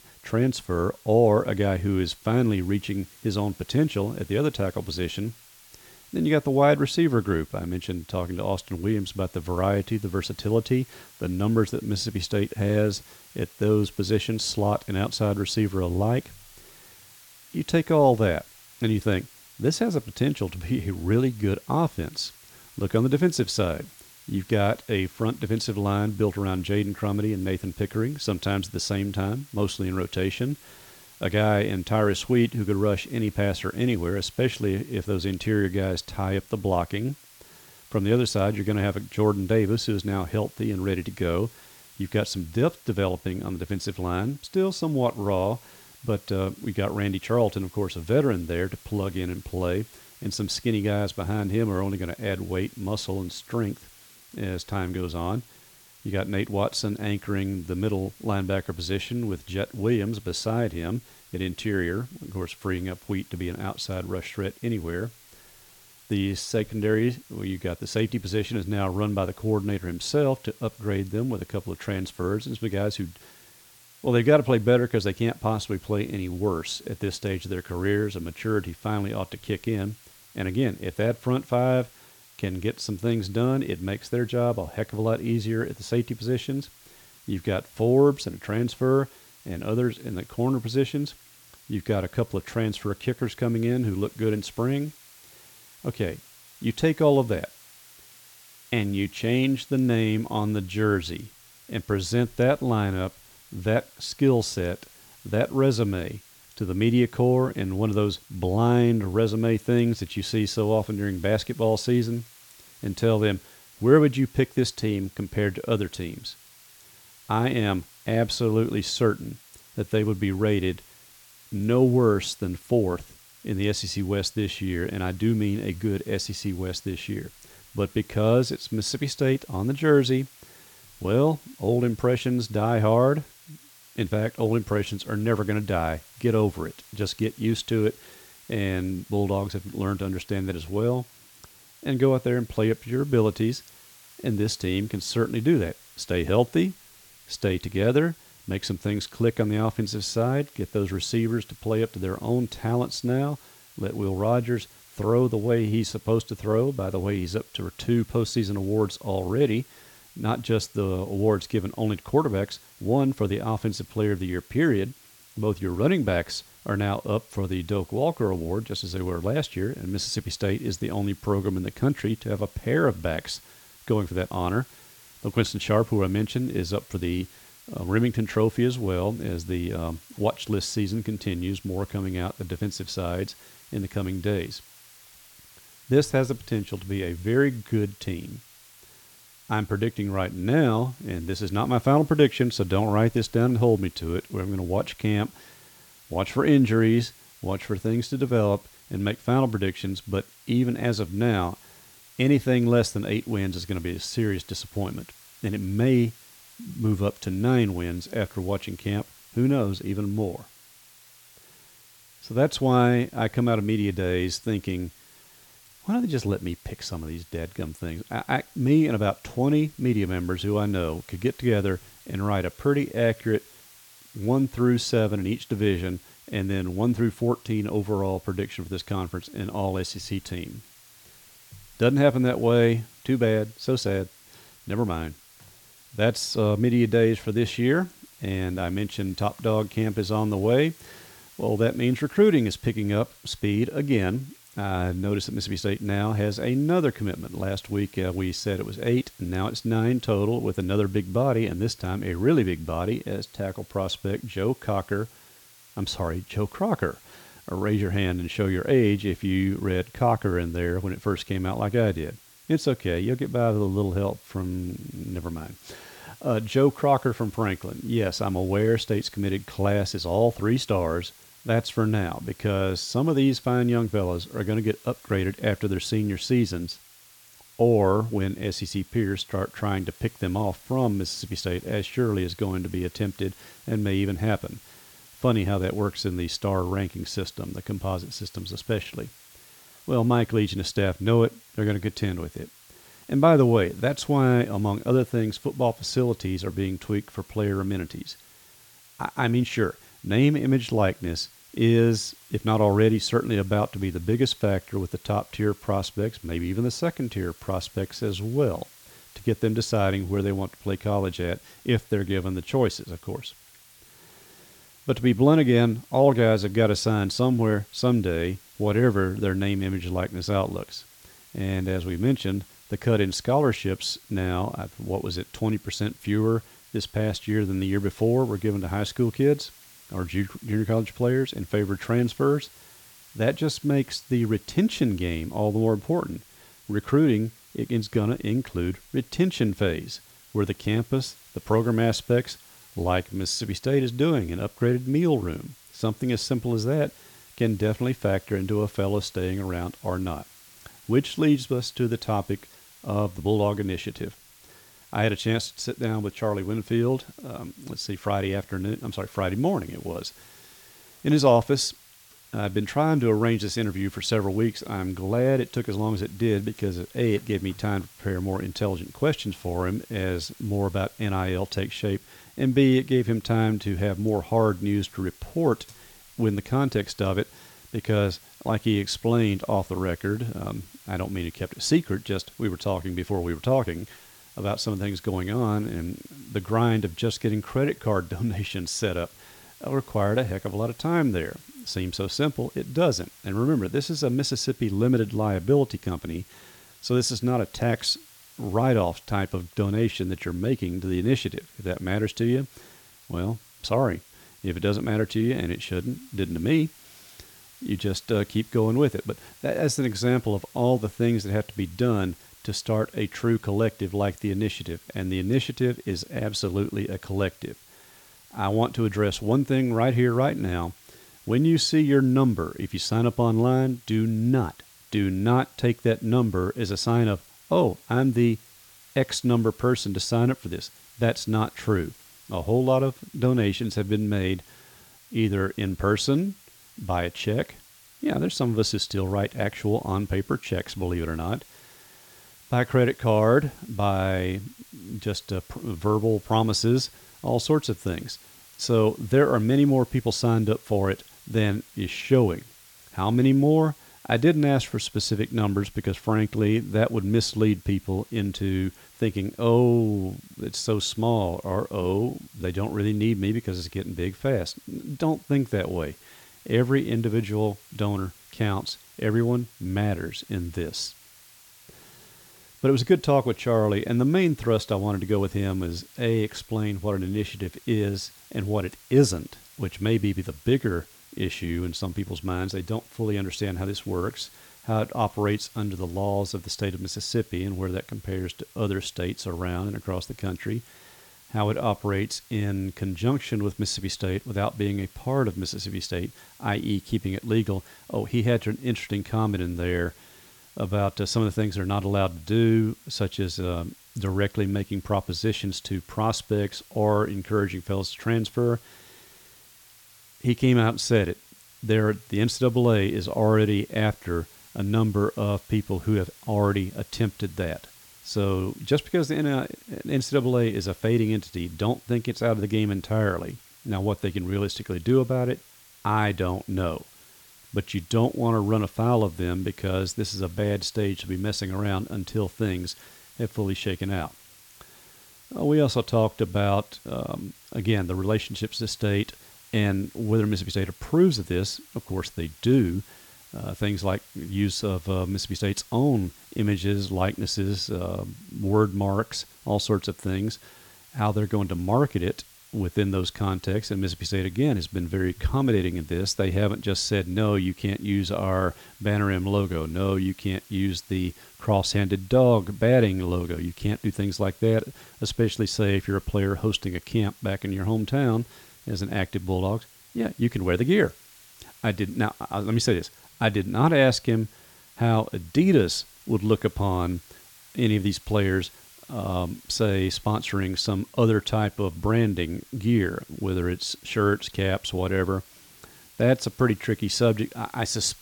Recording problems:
hiss; faint; throughout; 25 dB below the speech

